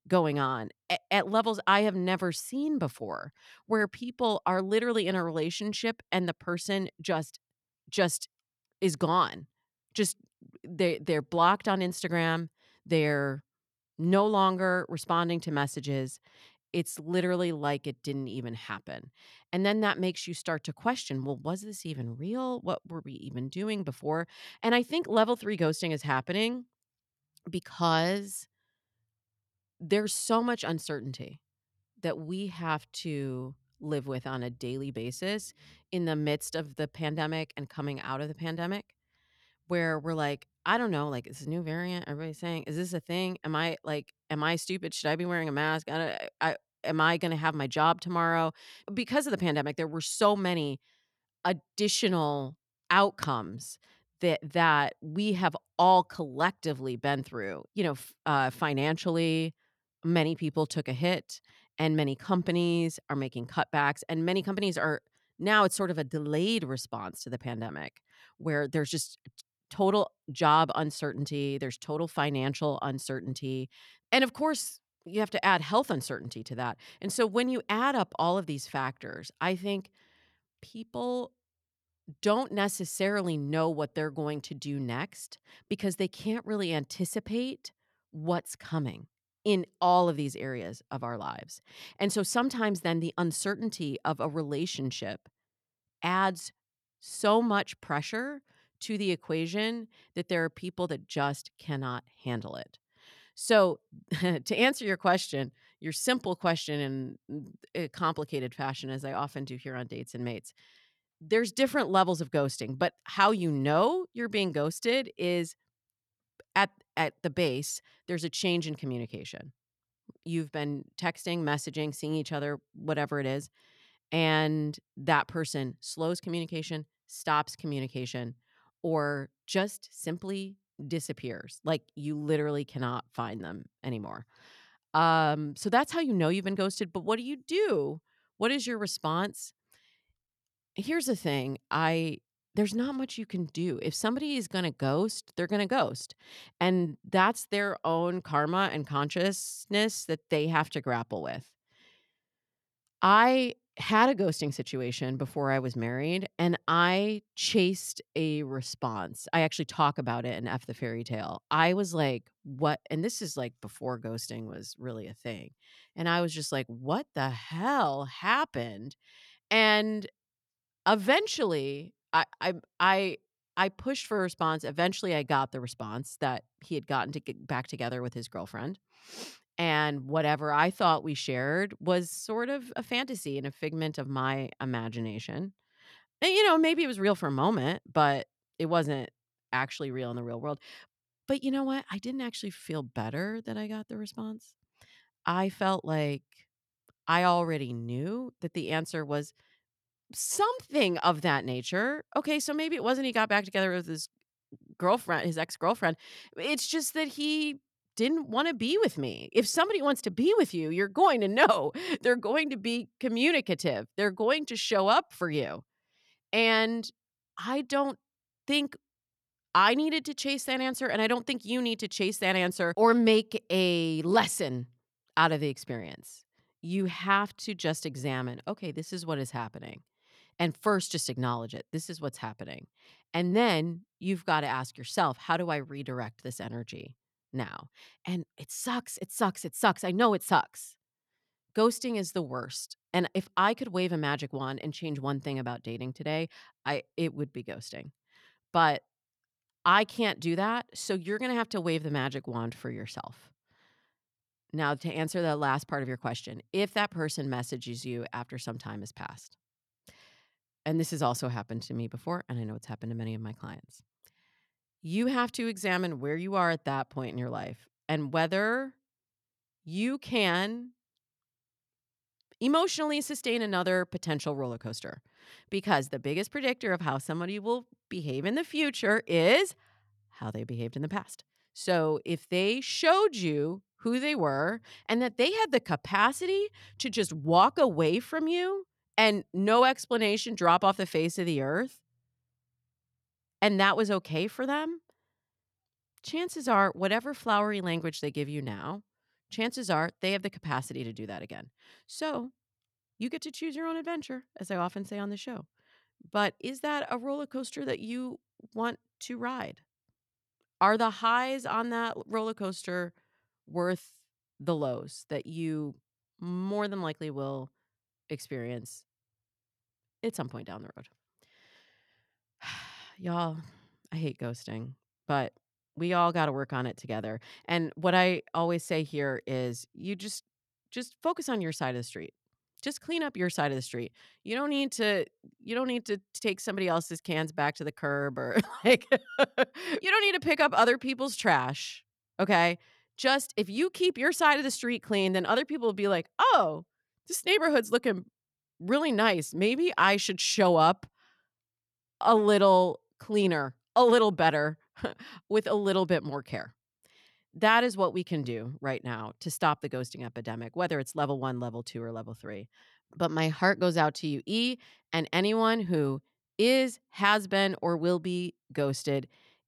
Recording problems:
none

